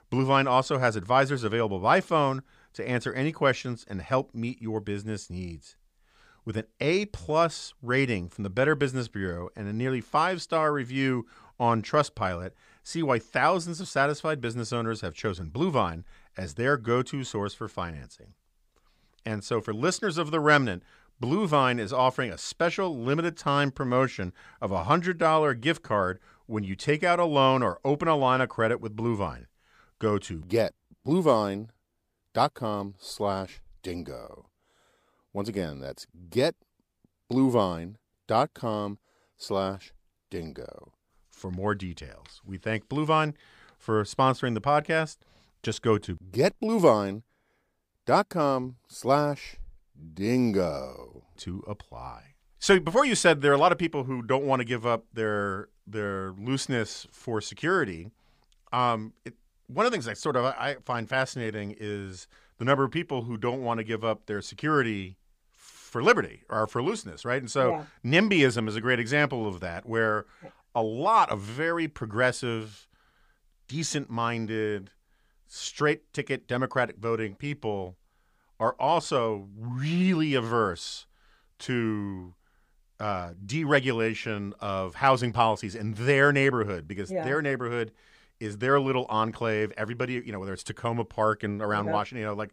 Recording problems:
none

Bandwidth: 15 kHz